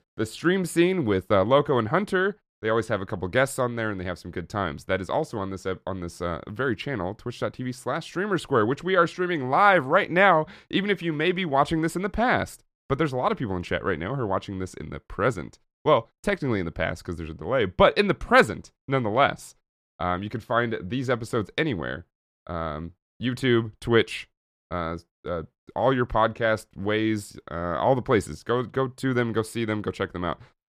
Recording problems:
none

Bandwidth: 14.5 kHz